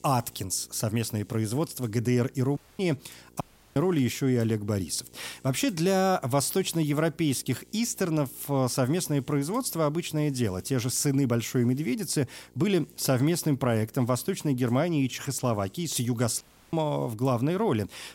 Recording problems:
electrical hum; faint; throughout; 60 Hz, 30 dB below the speech
audio cutting out; at 2.5 s, at 3.5 s and at 16 s

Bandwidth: 16 kHz